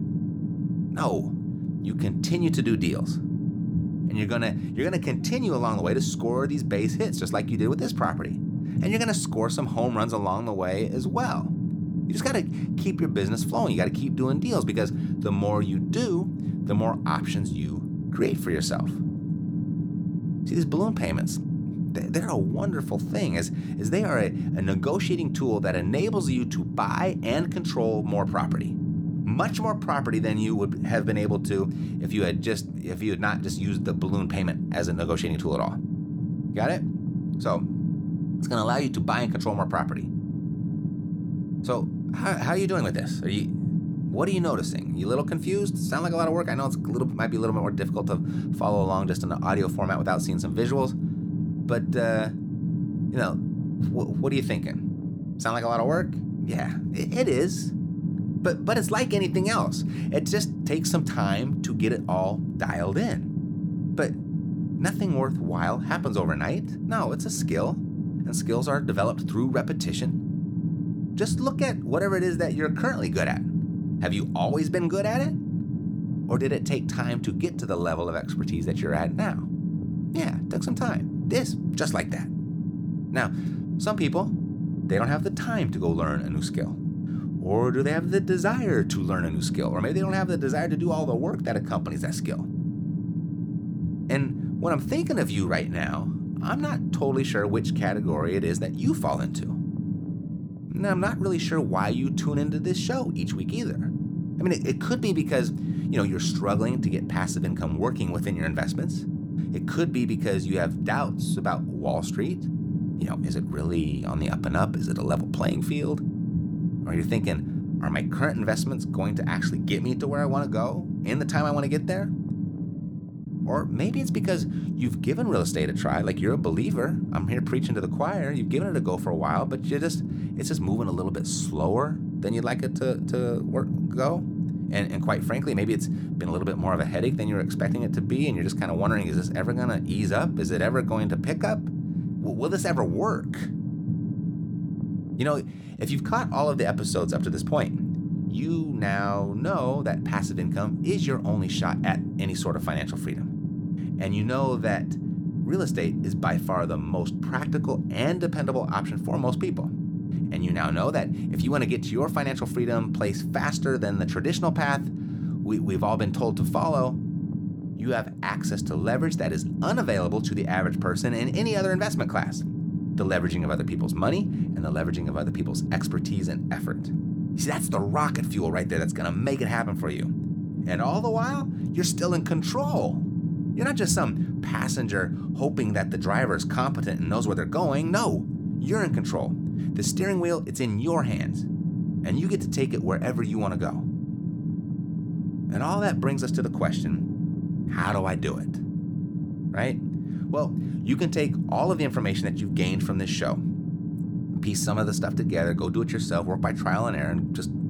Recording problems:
low rumble; loud; throughout; 7 dB below the speech

